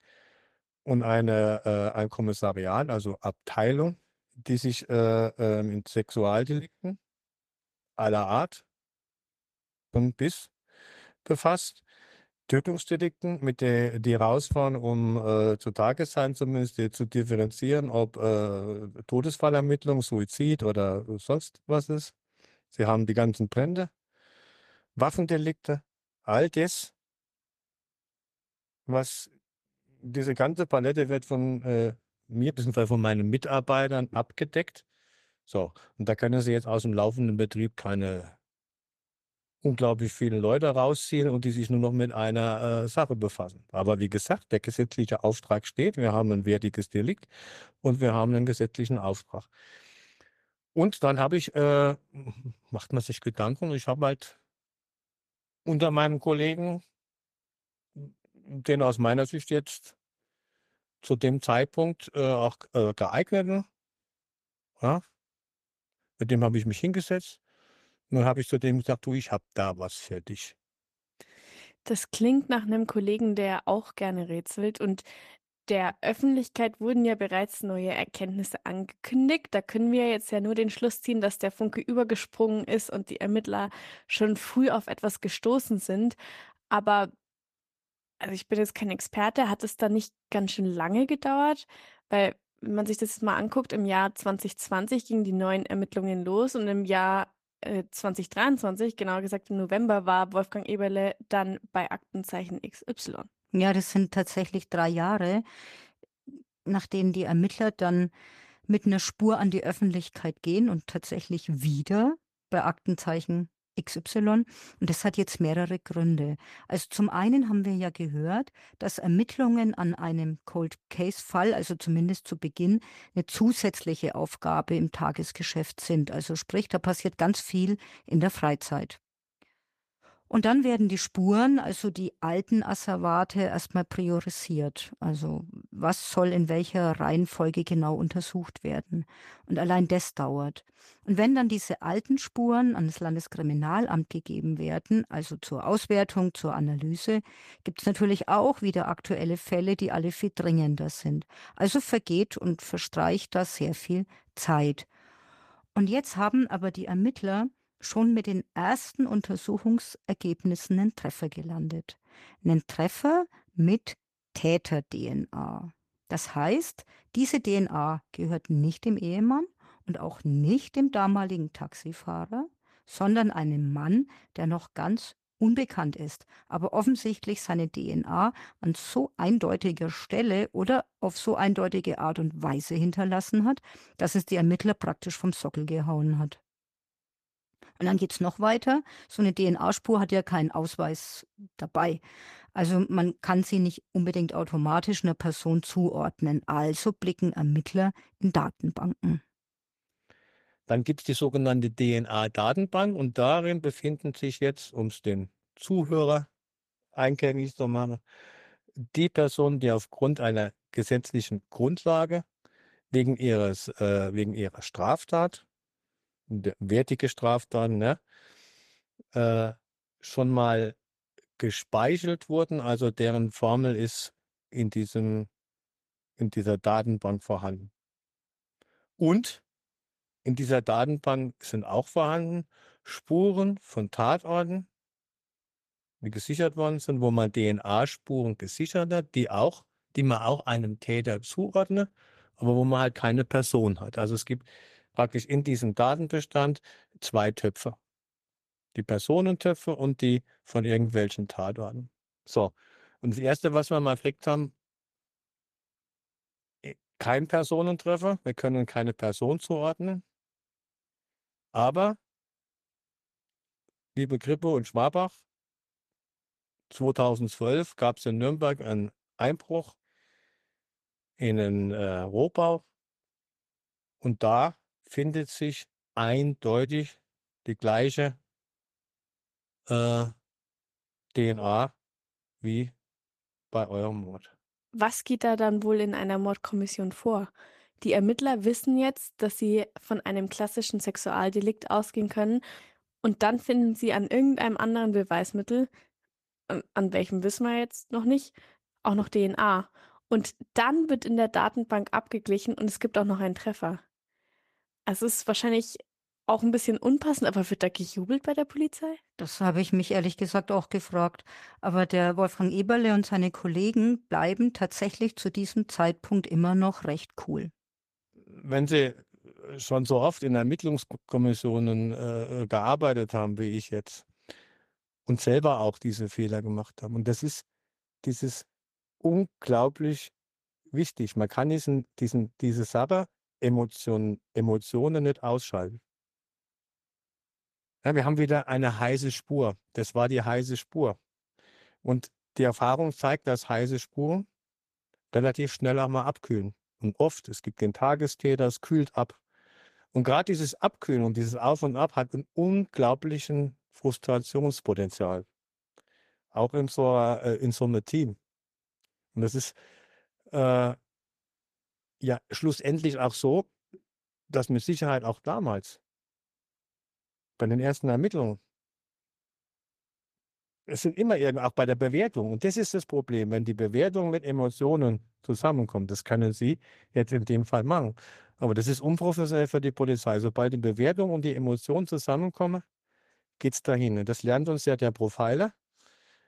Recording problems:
garbled, watery; slightly; nothing above 14.5 kHz

